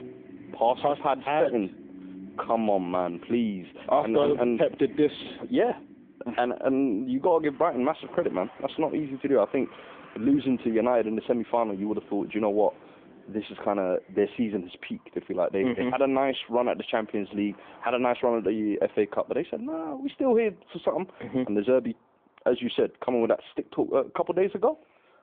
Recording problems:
phone-call audio
traffic noise; faint; throughout; 20 dB below the speech

